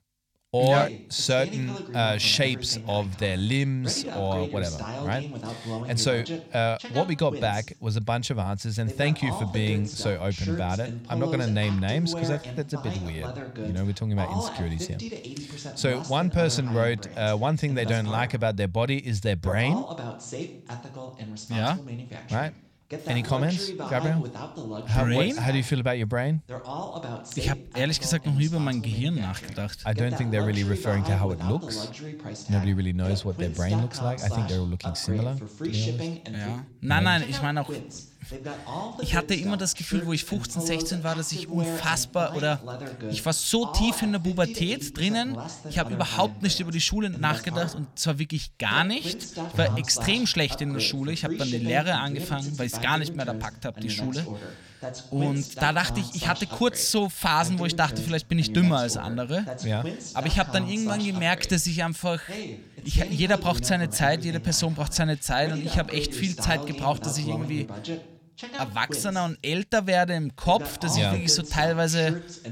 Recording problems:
voice in the background; noticeable; throughout; 10 dB below the speech

